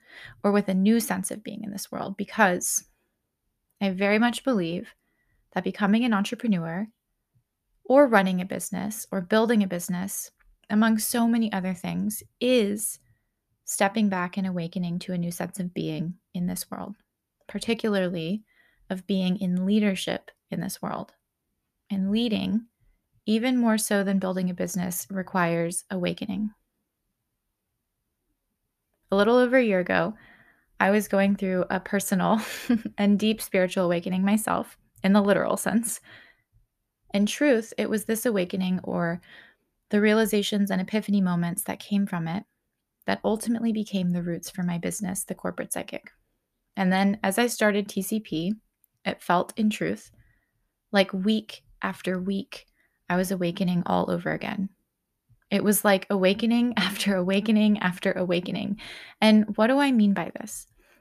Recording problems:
none

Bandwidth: 14.5 kHz